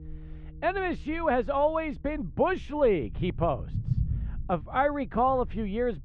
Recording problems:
muffled; very; fading above 2 kHz
background music; faint; until 4.5 s; 25 dB below the speech
low rumble; faint; throughout; 20 dB below the speech

